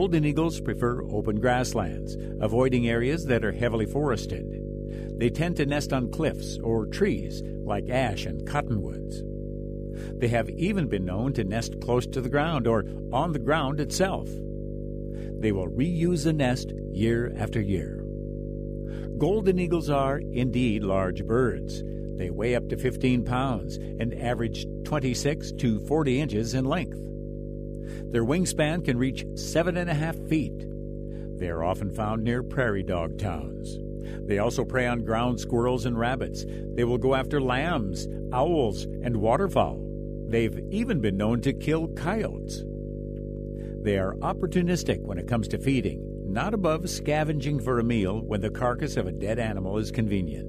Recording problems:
electrical hum; noticeable; throughout; 50 Hz, 10 dB below the speech
abrupt cut into speech; at the start

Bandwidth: 14.5 kHz